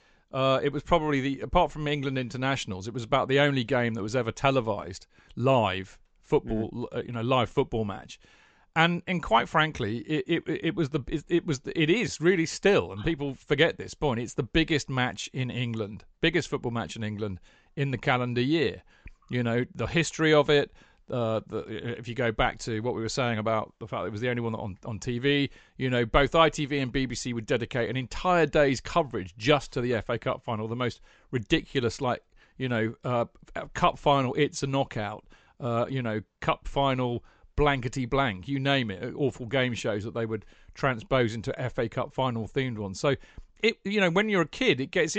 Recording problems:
high frequencies cut off; noticeable; nothing above 8 kHz
abrupt cut into speech; at the end

